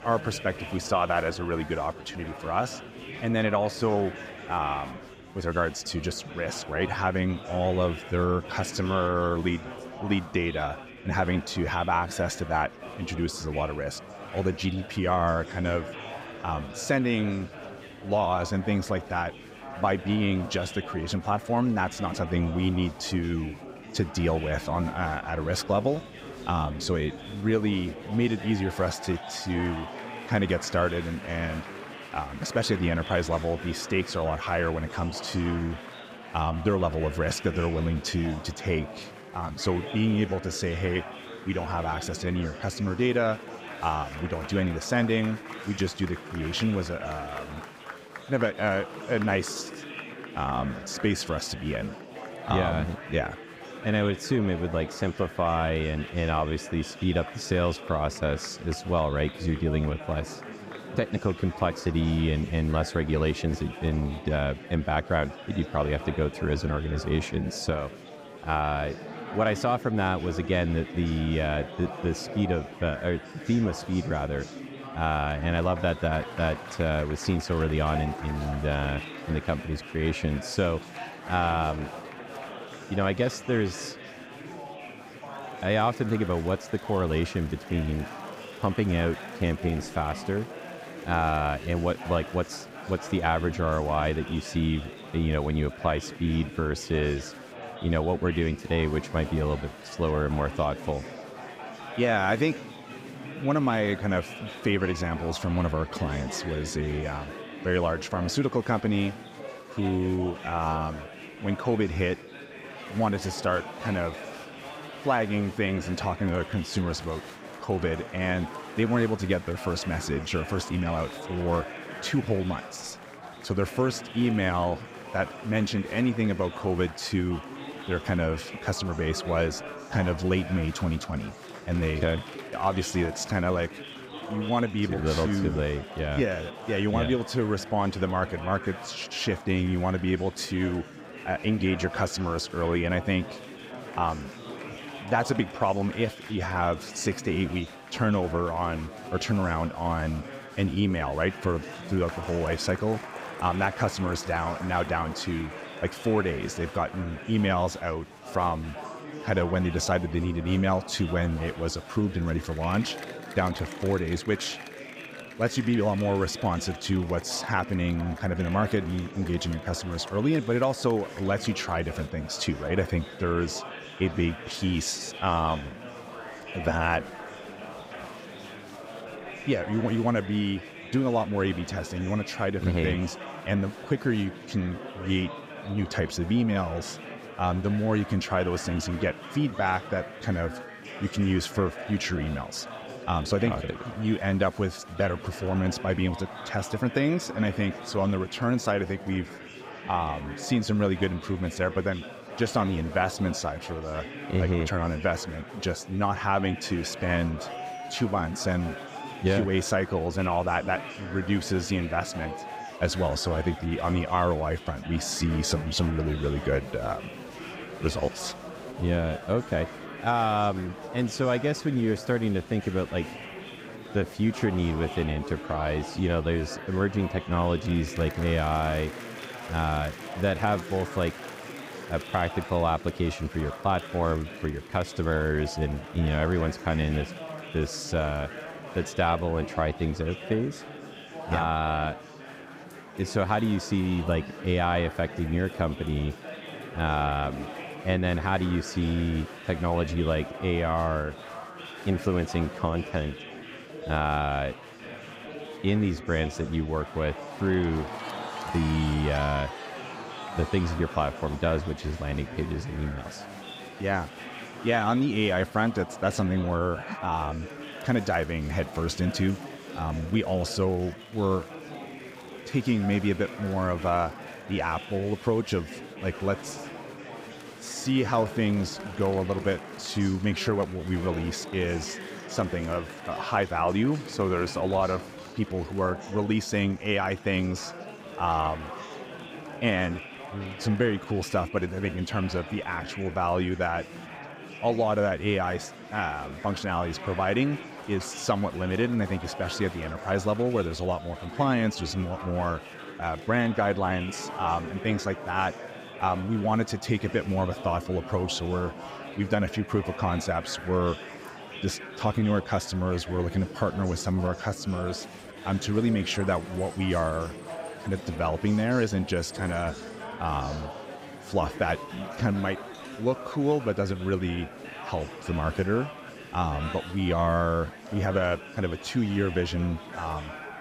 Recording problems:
murmuring crowd; noticeable; throughout; 10 dB below the speech

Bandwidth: 15.5 kHz